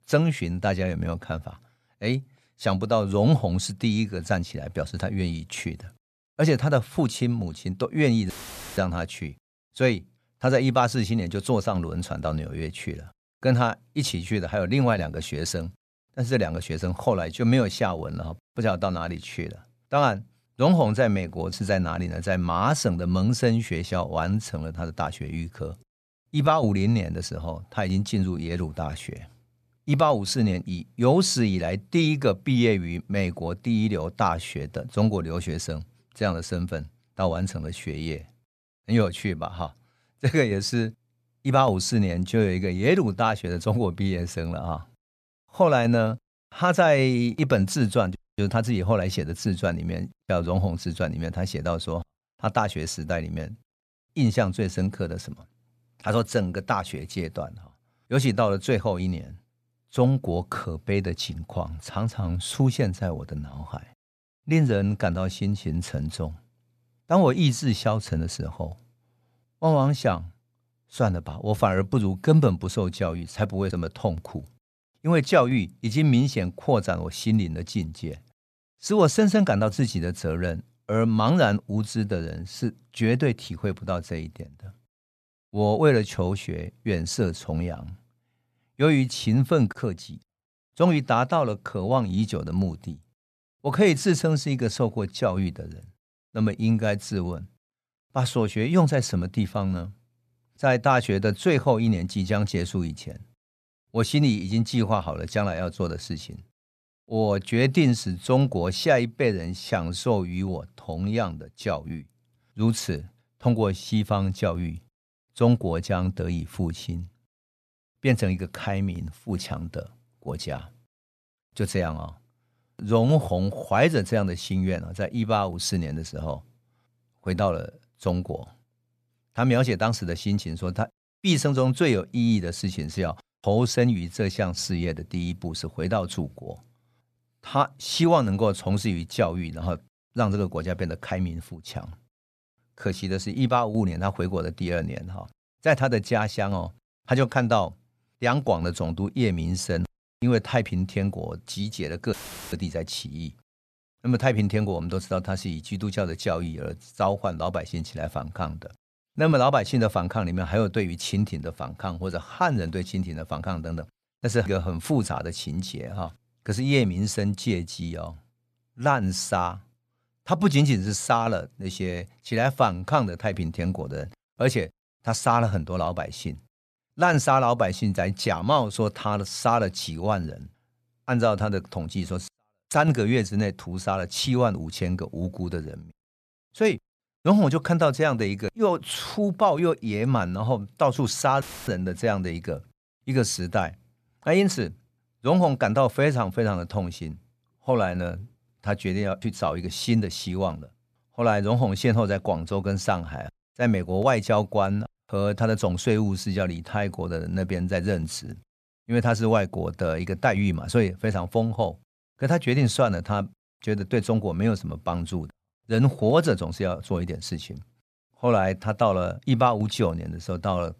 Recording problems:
audio cutting out; filled with static; at 8.5 s, at 2:32 and at 3:11

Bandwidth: 14 kHz